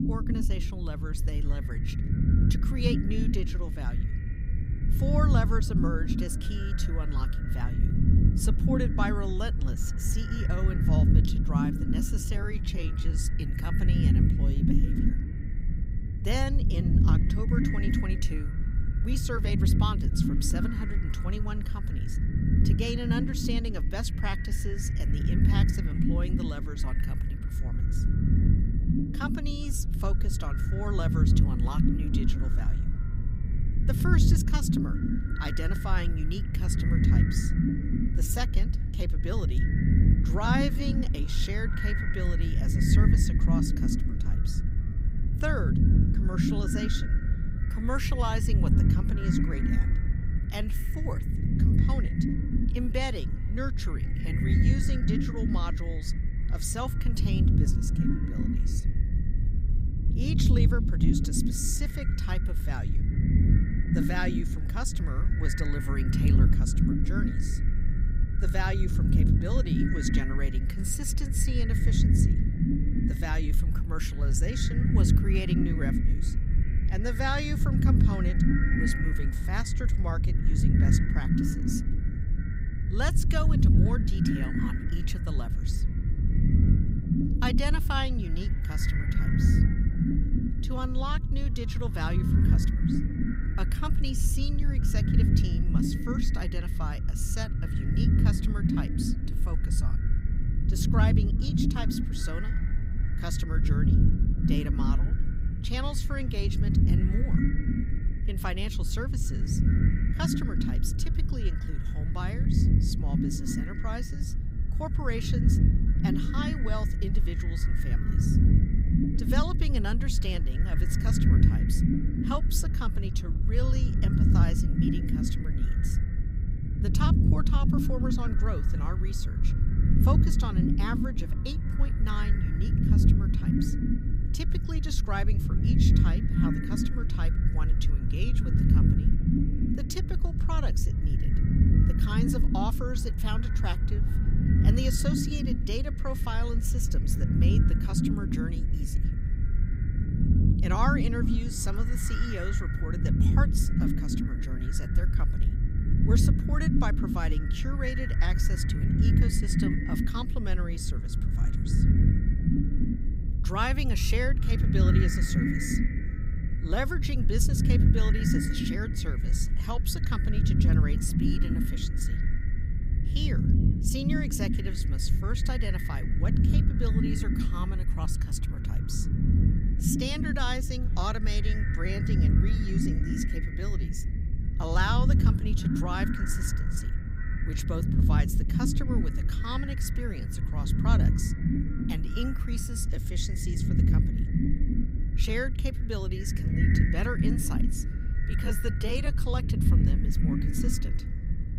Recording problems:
echo of what is said; strong; throughout; 400 ms later, 10 dB below the speech
low rumble; loud; throughout; 1 dB below the speech
uneven, jittery; strongly; from 12 s to 3:19

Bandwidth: 15.5 kHz